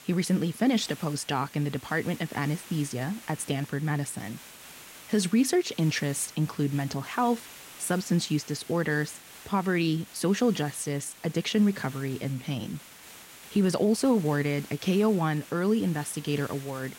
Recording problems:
hiss; noticeable; throughout; 20 dB below the speech

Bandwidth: 16 kHz